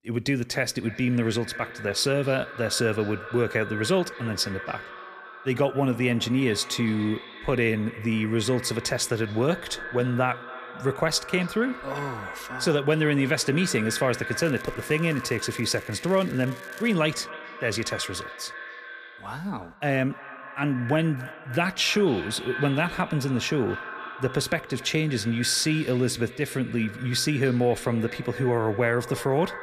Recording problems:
echo of what is said; noticeable; throughout; 280 ms later, 10 dB below the speech
crackling; faint; from 14 to 17 s; 25 dB below the speech

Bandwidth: 14.5 kHz